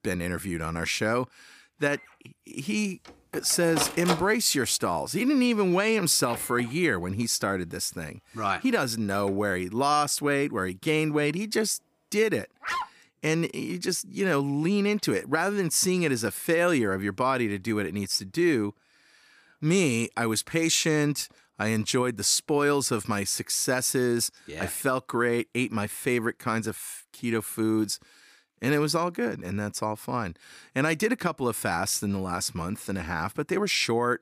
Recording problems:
household noises; noticeable; throughout; 10 dB below the speech
dog barking; noticeable; at 13 s; peak 5 dB below the speech

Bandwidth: 15 kHz